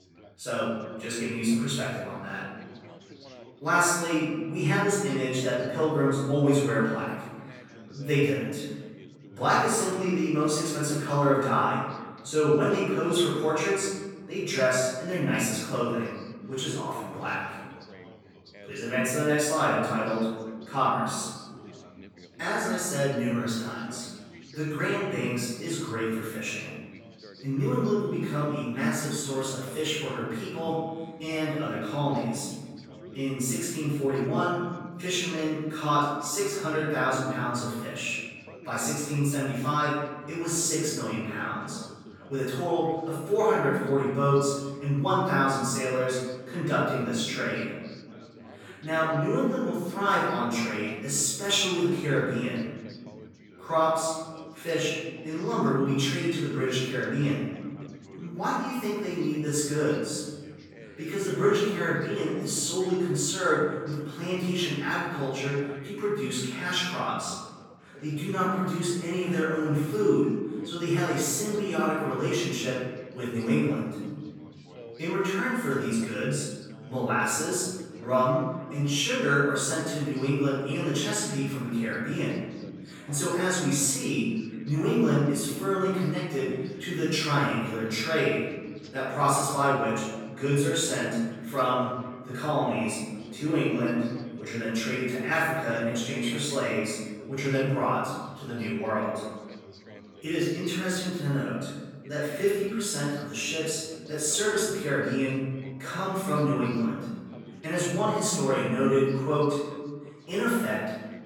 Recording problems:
room echo; strong; dies away in 1.6 s
off-mic speech; far
background chatter; faint; throughout; 4 voices, 20 dB below the speech

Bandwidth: 18 kHz